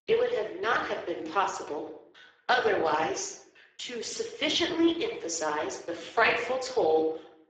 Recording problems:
garbled, watery; badly; nothing above 7.5 kHz
thin; somewhat; fading below 350 Hz
room echo; slight; dies away in 0.7 s
off-mic speech; somewhat distant

